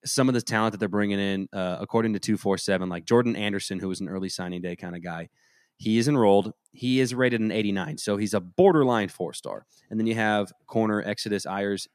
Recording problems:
none

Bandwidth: 14.5 kHz